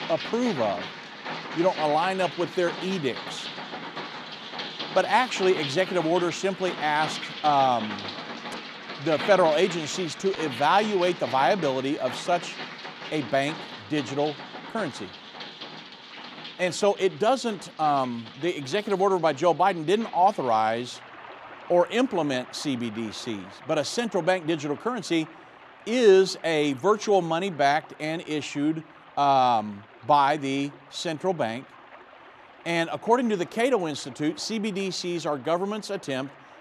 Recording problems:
rain or running water; noticeable; throughout; 10 dB below the speech

